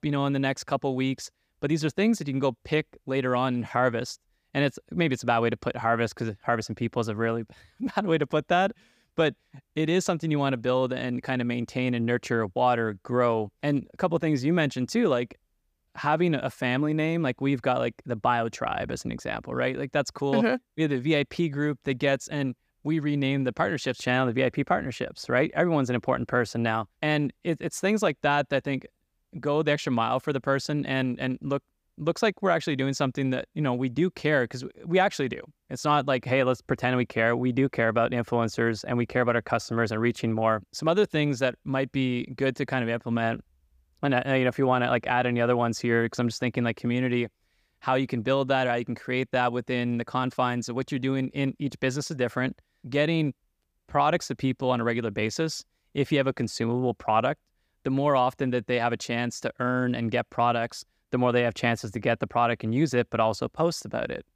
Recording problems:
none

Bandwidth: 15 kHz